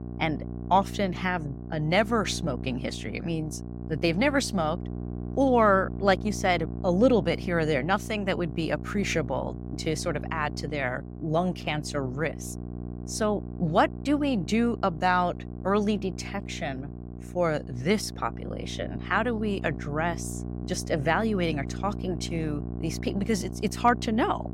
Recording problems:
electrical hum; noticeable; throughout; 60 Hz, 15 dB below the speech

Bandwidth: 16 kHz